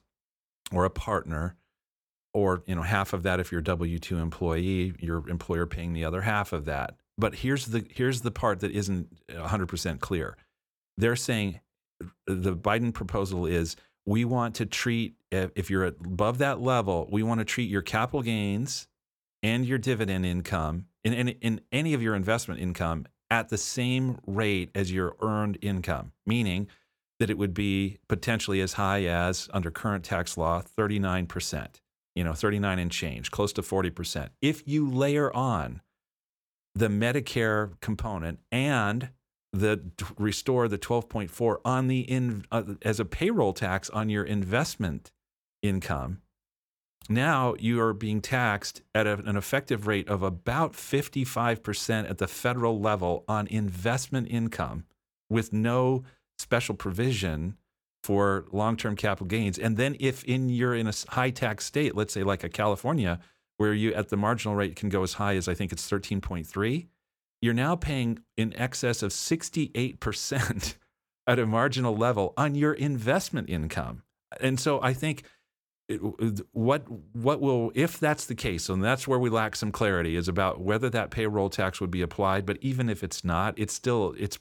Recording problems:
none

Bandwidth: 18.5 kHz